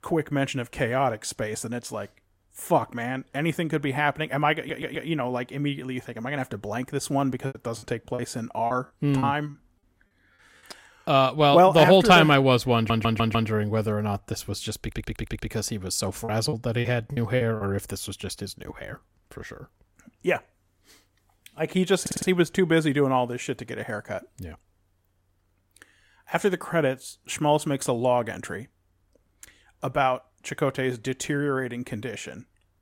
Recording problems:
audio stuttering; 4 times, first at 4.5 s
choppy; very; from 7.5 to 9.5 s and from 16 to 18 s; 14% of the speech affected

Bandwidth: 16 kHz